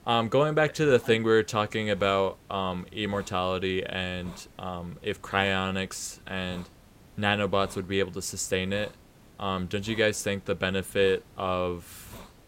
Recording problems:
hiss; faint; throughout; 25 dB below the speech

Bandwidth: 16 kHz